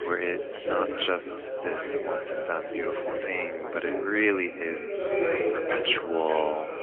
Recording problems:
phone-call audio; poor line; nothing above 3.5 kHz
echo of what is said; strong; from 4 s on; 450 ms later, 10 dB below the speech
background chatter; loud; throughout; 4 voices, 2 dB below the speech

